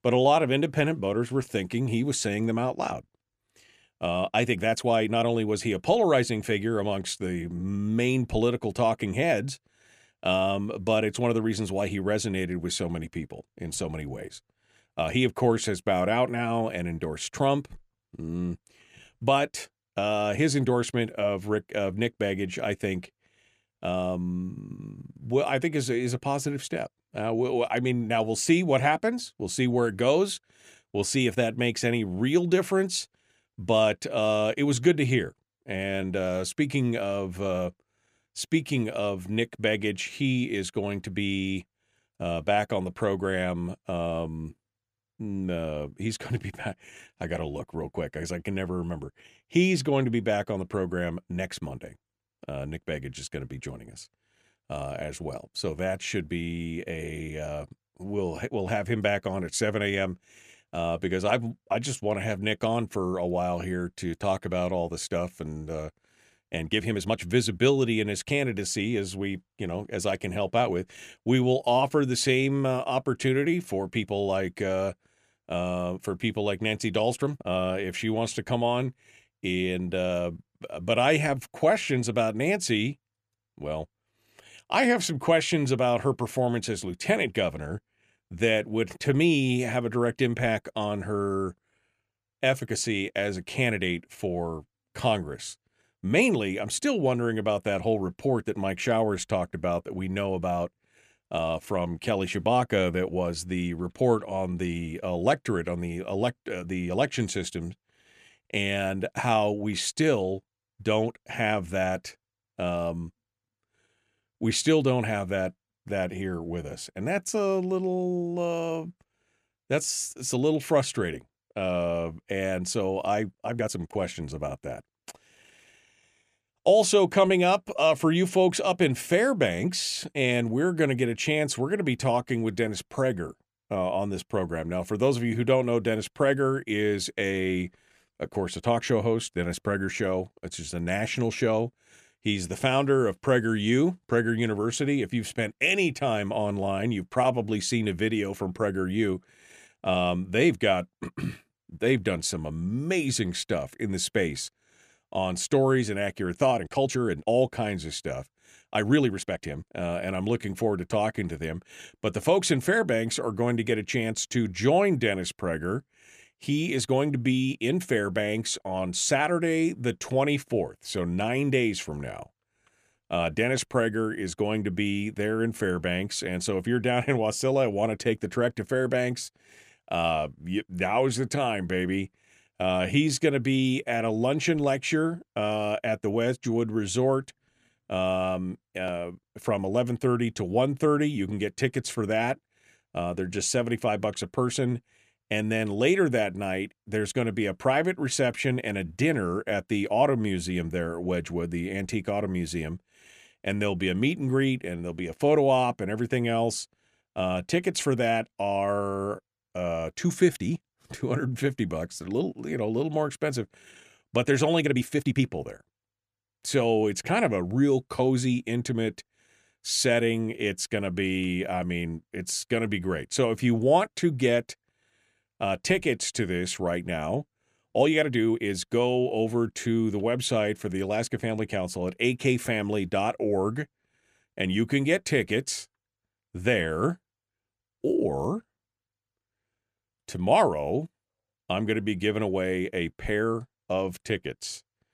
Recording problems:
uneven, jittery; strongly; from 4.5 s to 3:48

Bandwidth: 14.5 kHz